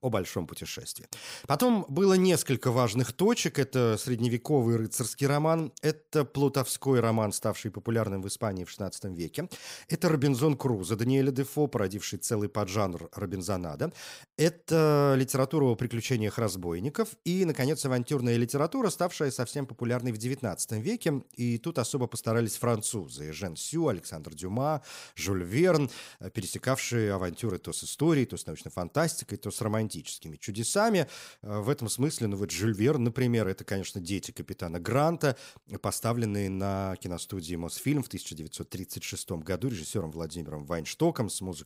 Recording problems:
none

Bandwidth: 15.5 kHz